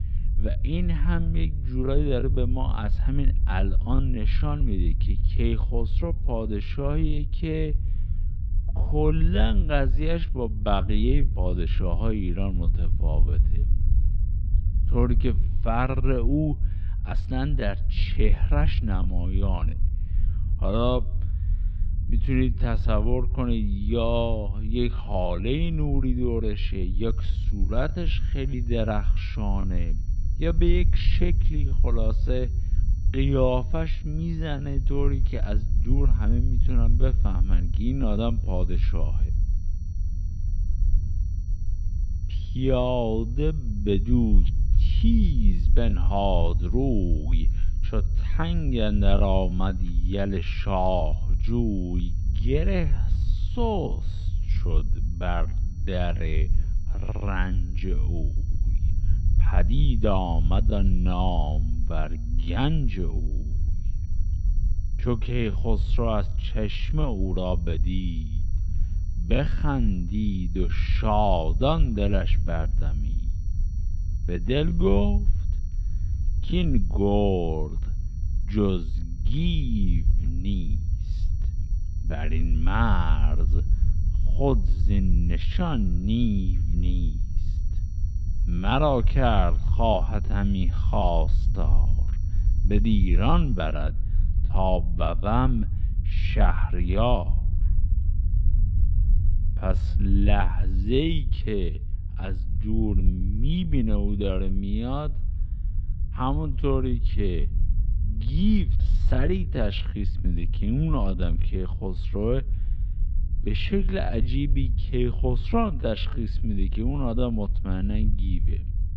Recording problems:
wrong speed, natural pitch; too slow; 0.6 times normal speed
muffled; slightly; fading above 4 kHz
low rumble; noticeable; throughout; 15 dB below the speech
high-pitched whine; faint; from 27 s to 1:34; 6 kHz, 35 dB below the speech

